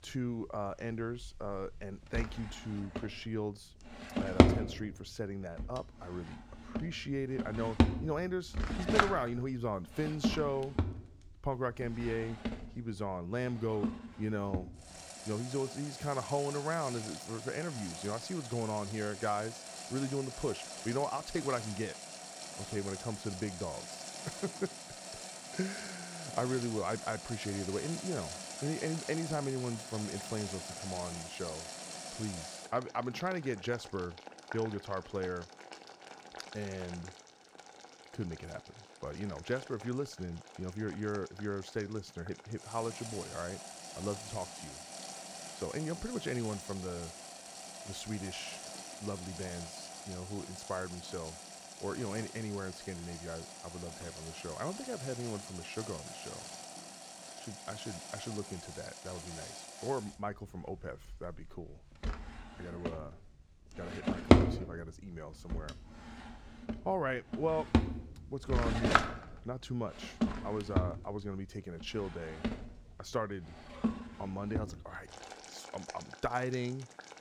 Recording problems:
household noises; very loud; throughout; as loud as the speech

